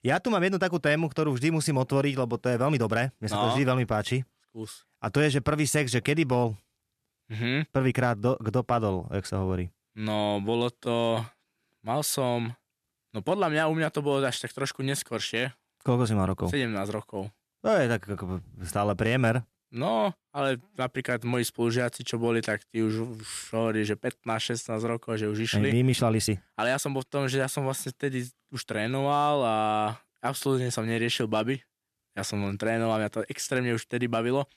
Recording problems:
uneven, jittery; strongly; from 2.5 to 29 s

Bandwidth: 13.5 kHz